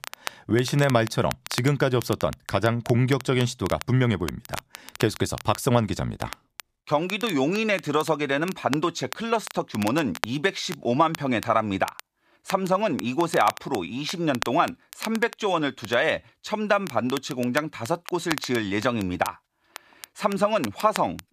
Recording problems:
crackle, like an old record; noticeable; 15 dB below the speech

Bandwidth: 14.5 kHz